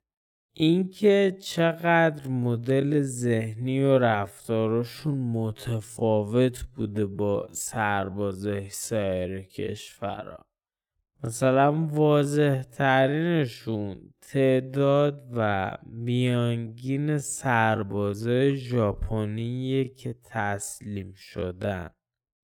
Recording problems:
wrong speed, natural pitch; too slow; 0.5 times normal speed

